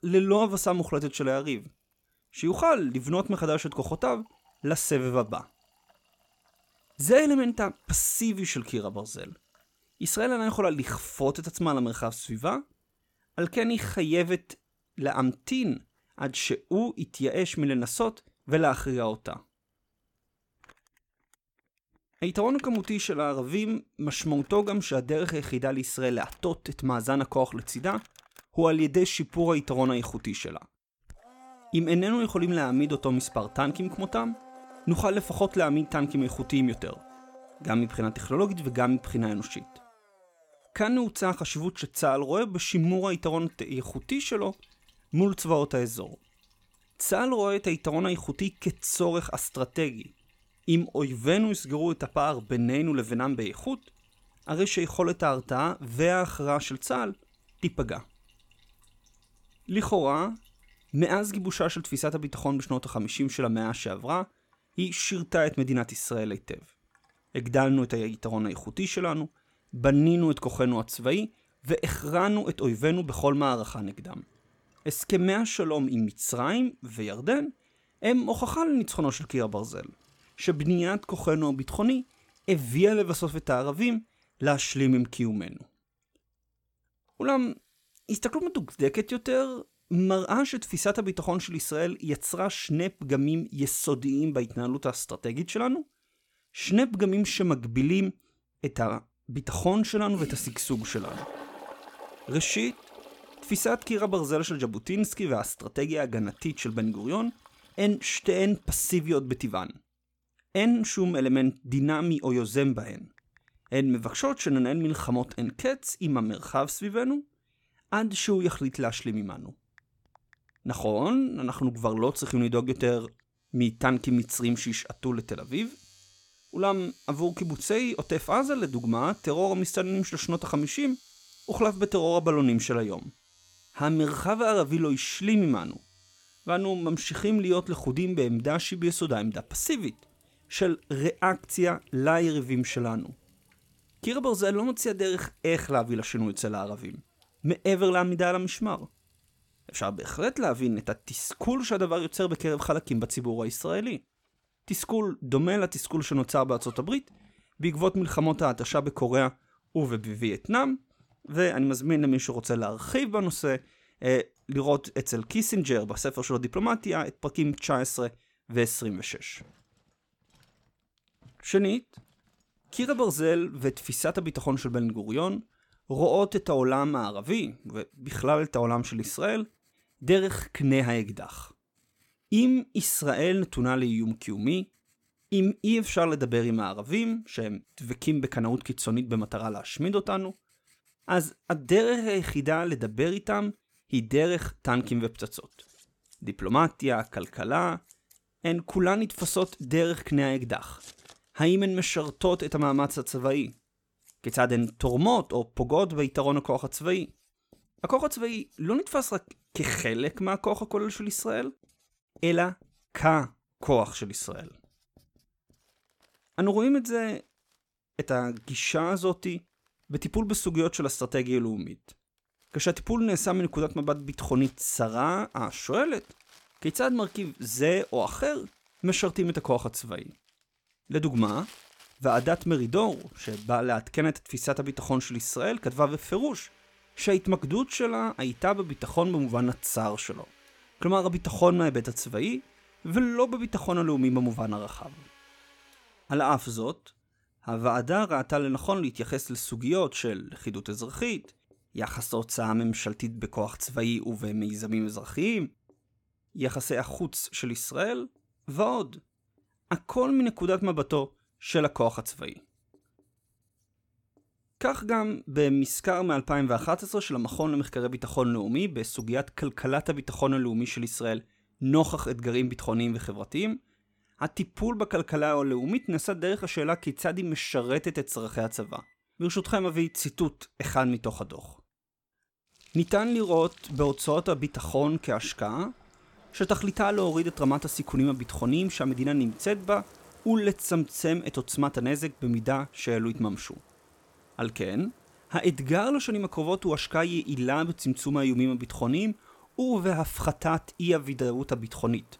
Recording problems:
household noises; faint; throughout; 30 dB below the speech

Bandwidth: 17 kHz